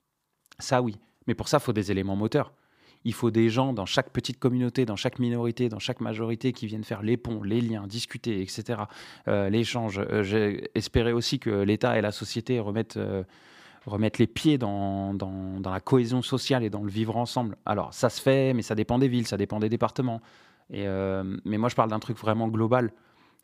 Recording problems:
none

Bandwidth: 15 kHz